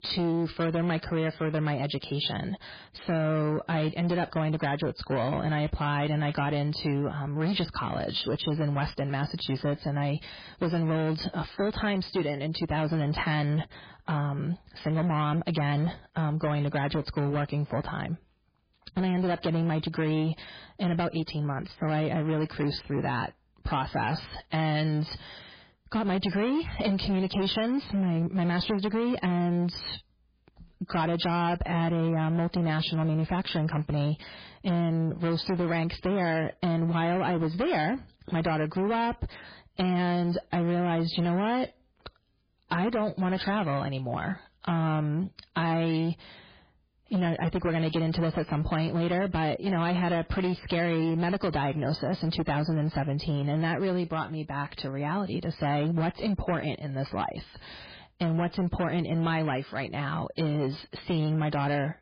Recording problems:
garbled, watery; badly; nothing above 5 kHz
distortion; slight; 17% of the sound clipped

